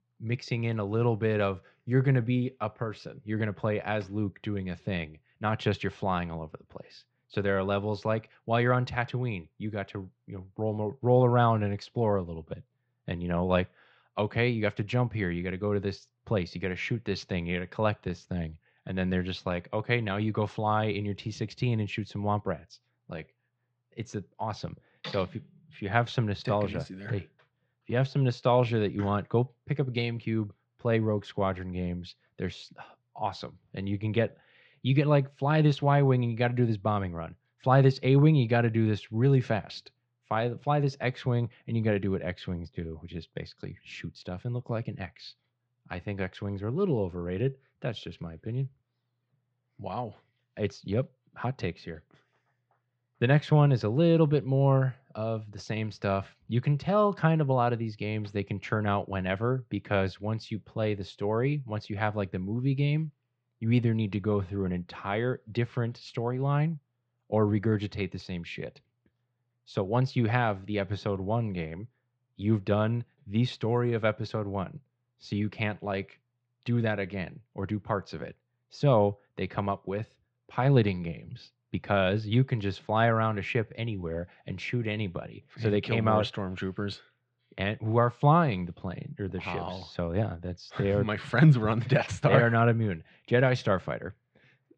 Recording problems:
muffled; slightly; fading above 4 kHz

